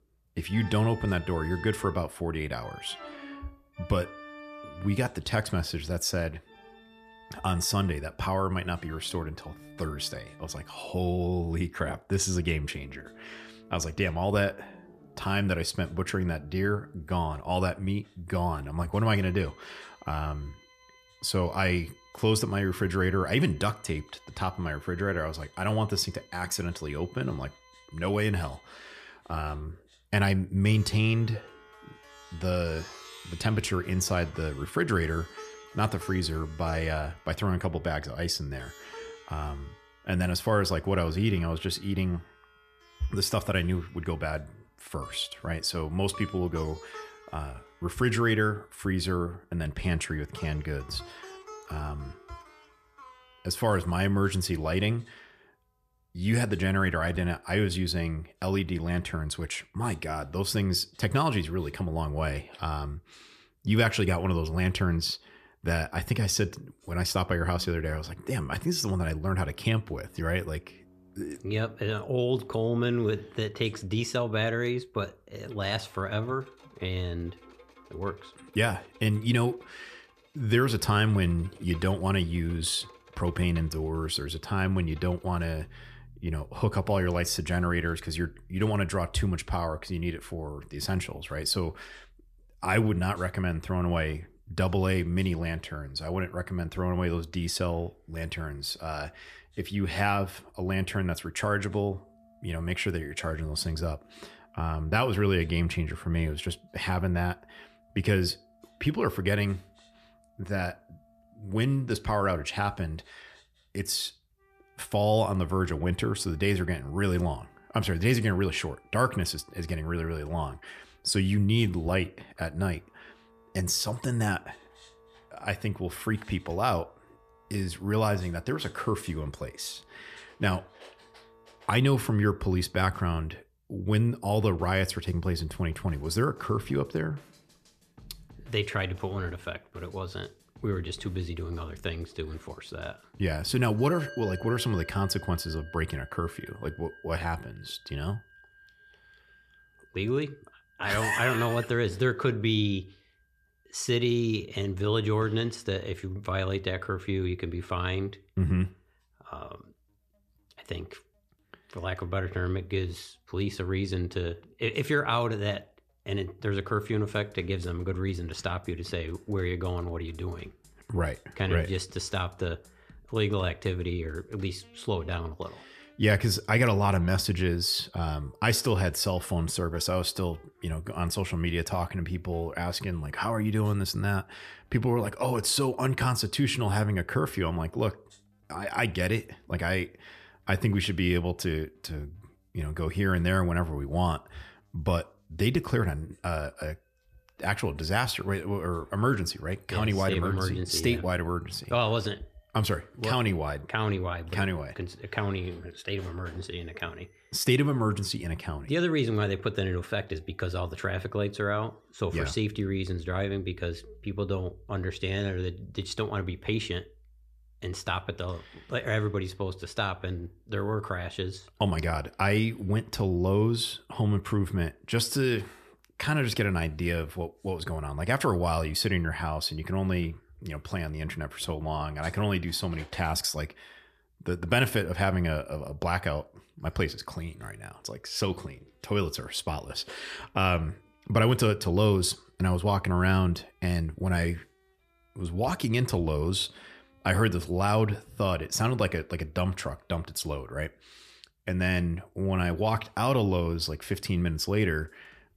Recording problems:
background music; faint; throughout; 25 dB below the speech

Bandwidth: 14.5 kHz